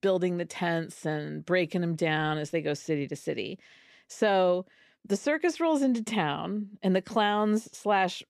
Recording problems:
none

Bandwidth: 14.5 kHz